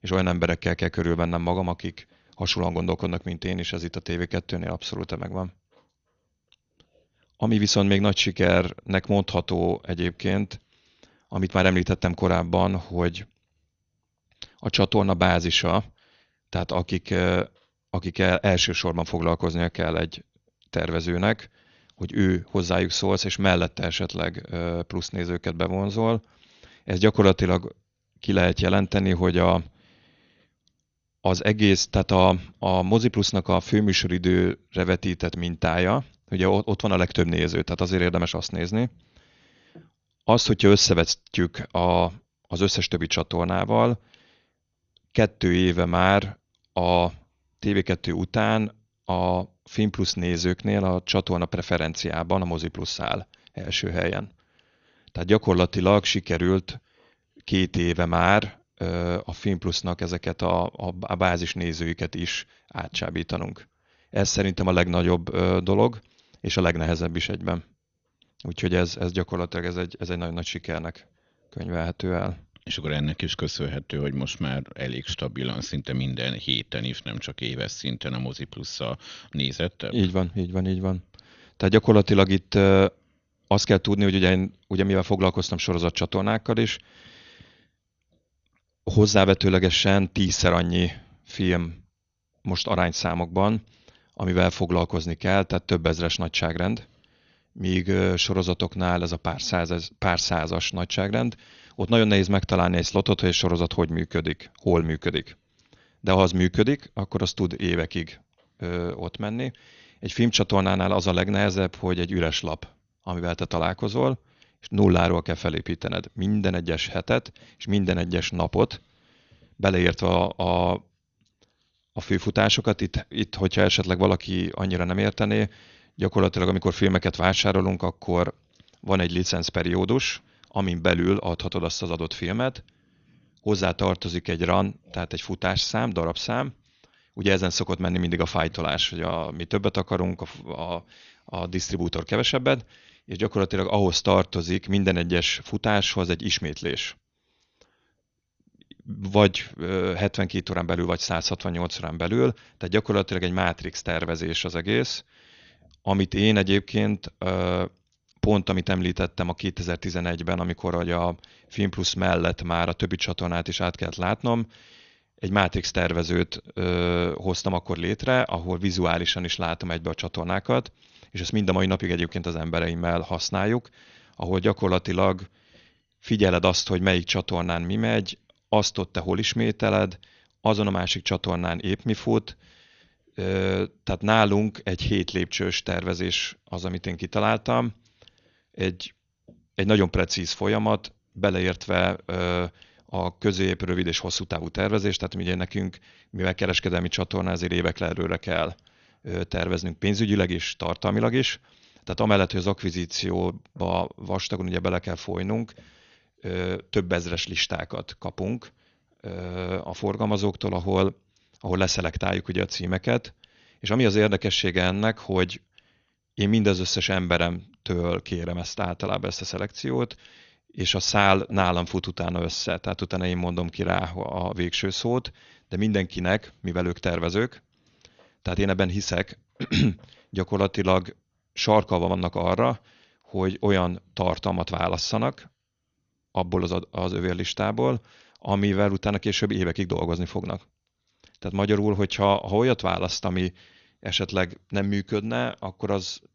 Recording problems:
garbled, watery; slightly; nothing above 6.5 kHz

